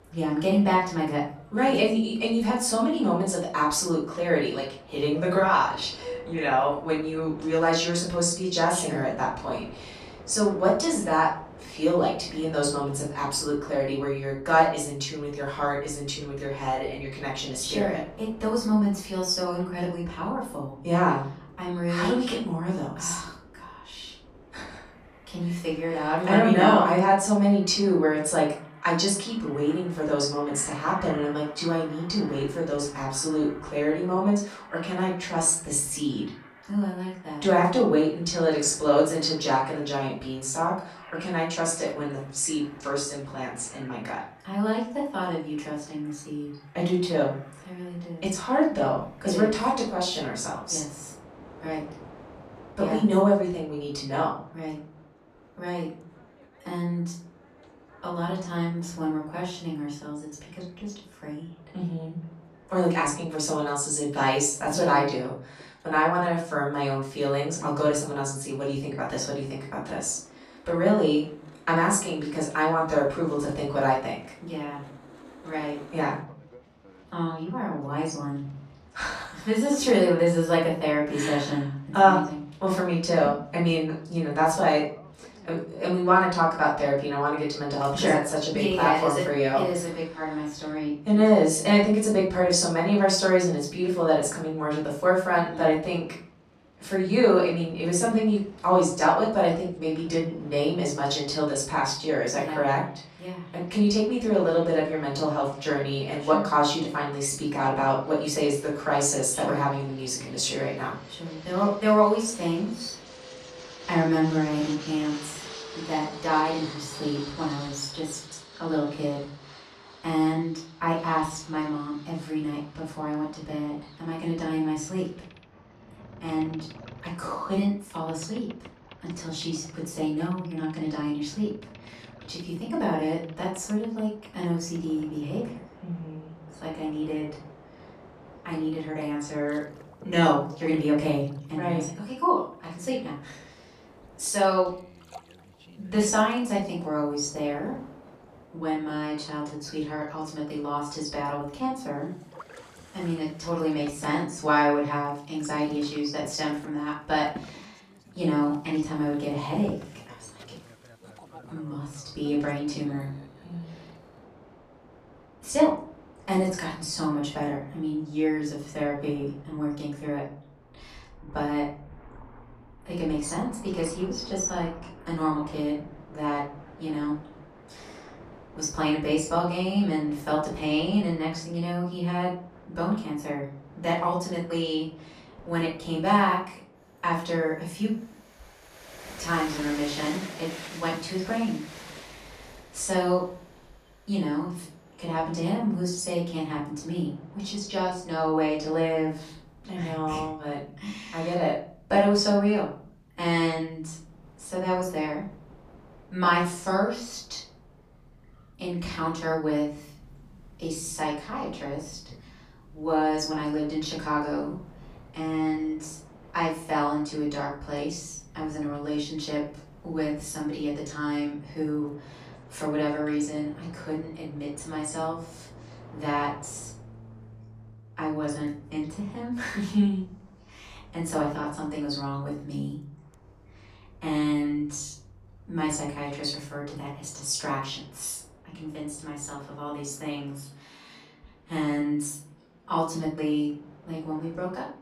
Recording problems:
off-mic speech; far
room echo; noticeable; dies away in 0.5 s
train or aircraft noise; faint; throughout; 20 dB below the speech

